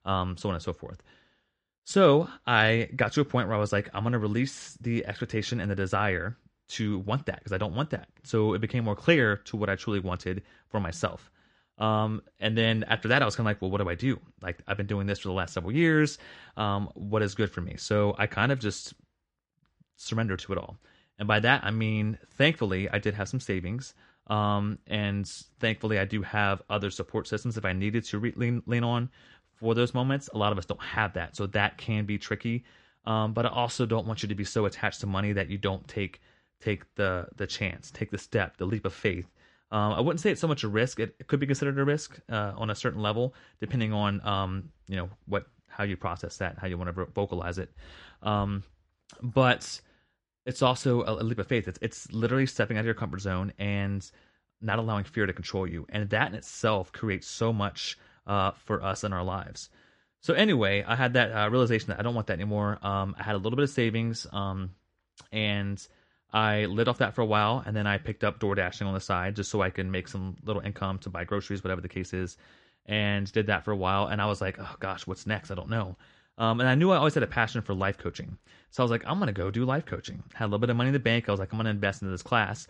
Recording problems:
garbled, watery; slightly

